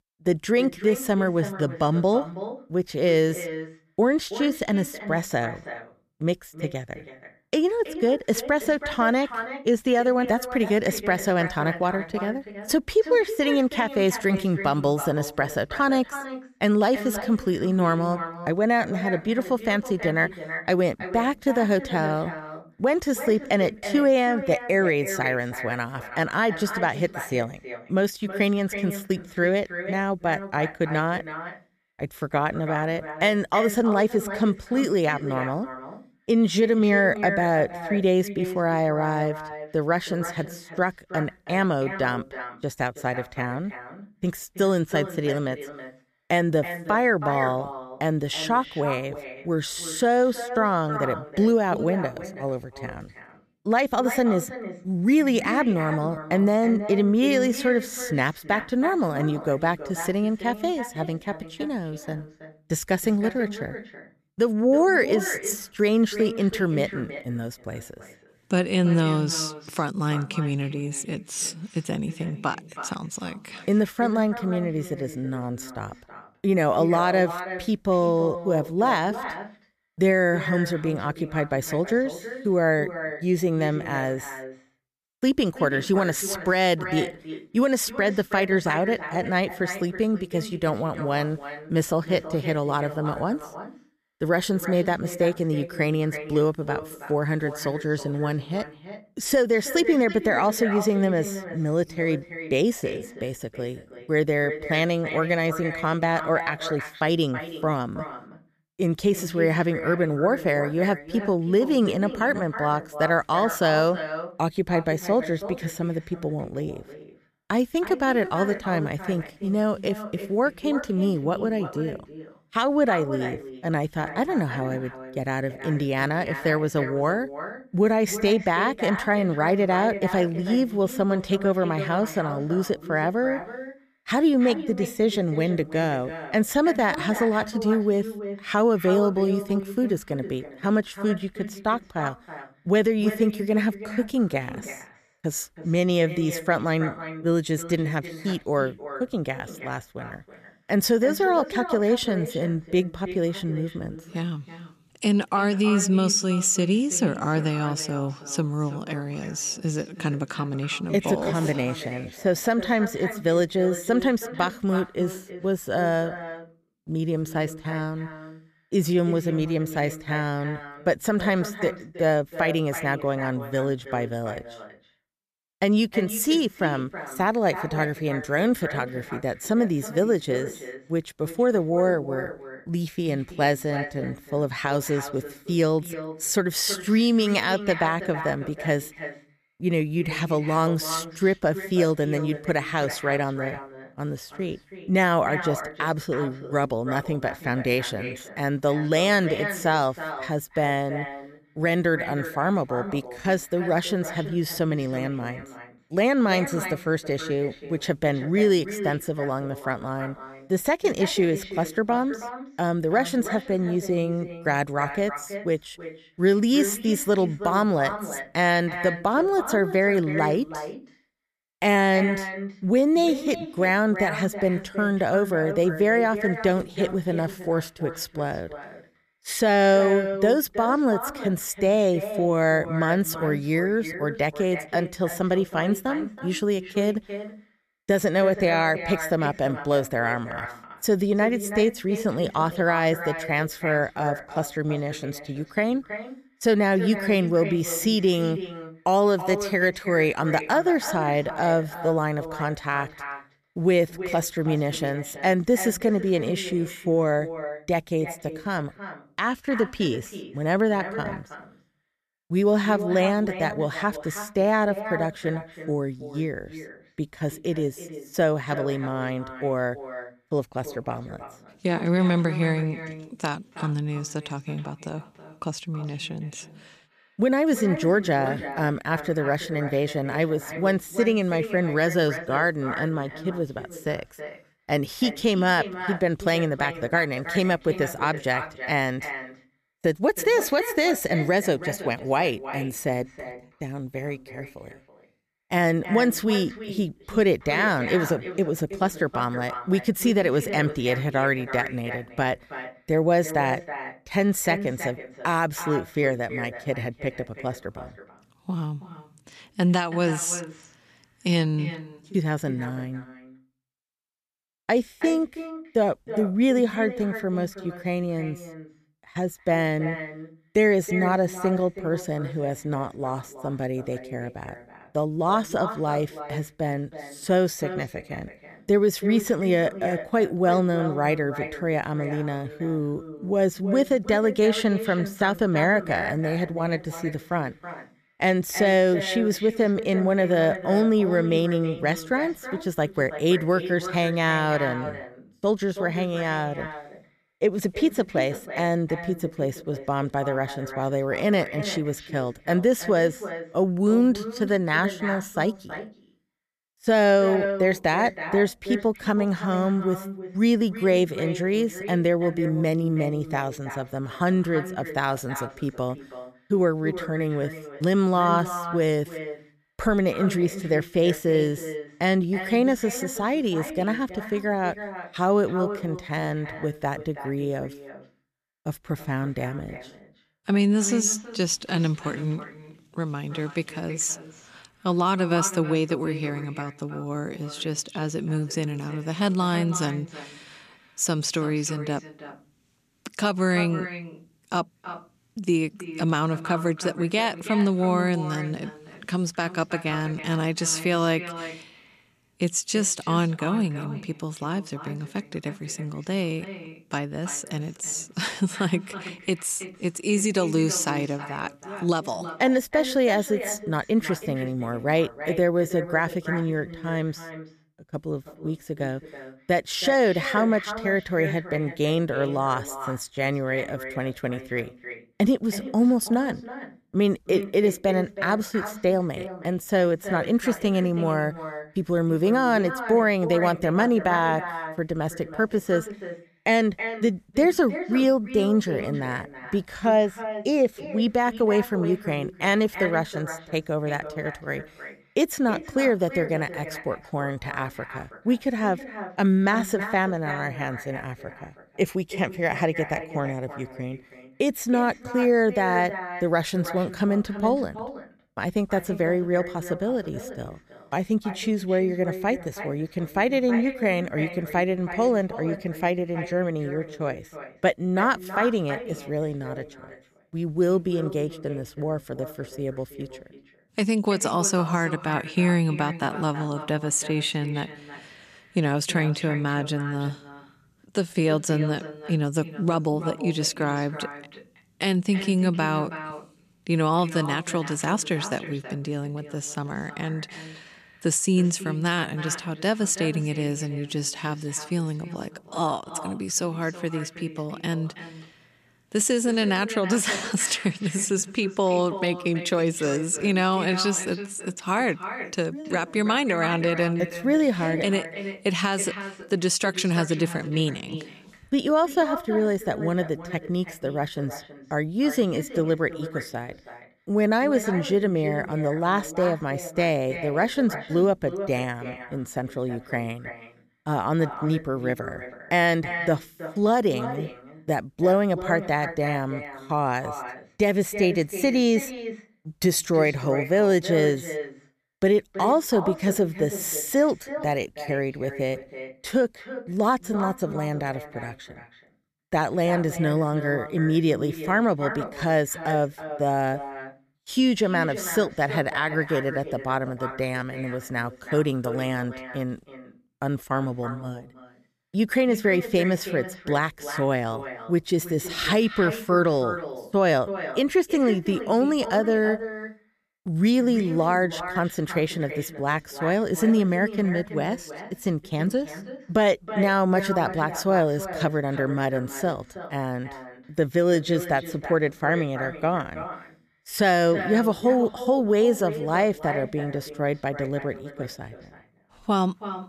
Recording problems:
echo of what is said; strong; throughout; 320 ms later, 10 dB below the speech

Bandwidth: 14.5 kHz